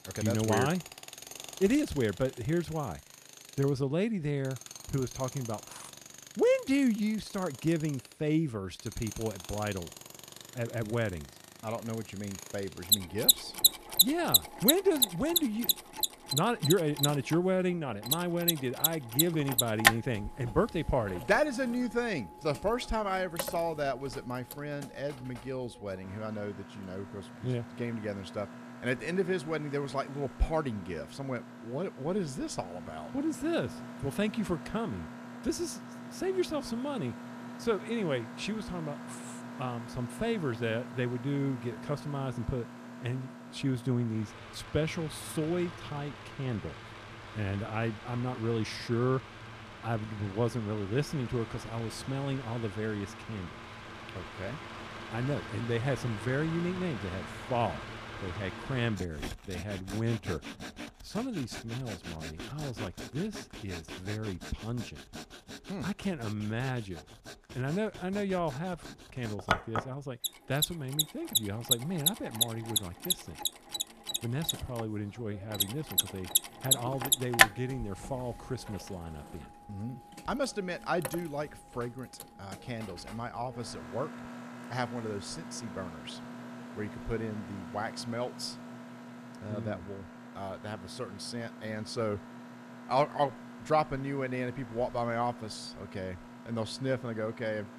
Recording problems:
machinery noise; loud; throughout; as loud as the speech

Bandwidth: 14.5 kHz